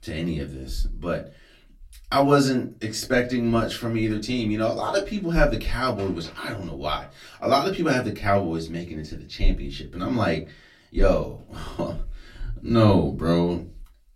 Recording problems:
off-mic speech; far
room echo; very slight; dies away in 0.2 s

